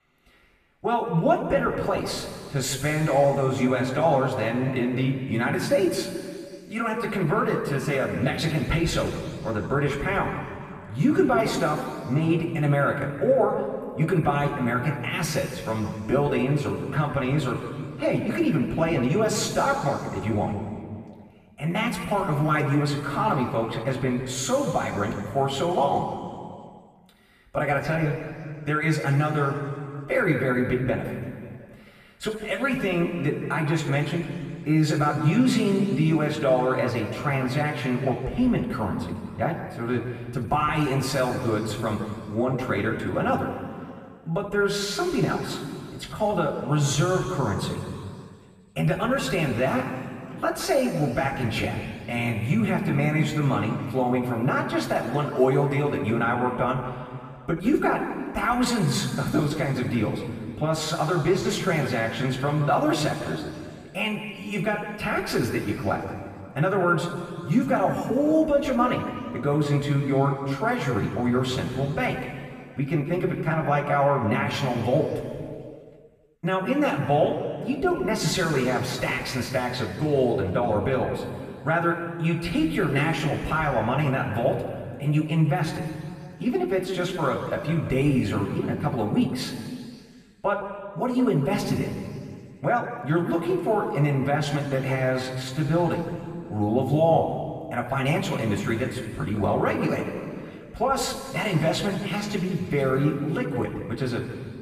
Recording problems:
off-mic speech; far
room echo; noticeable; dies away in 2.1 s

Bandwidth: 14.5 kHz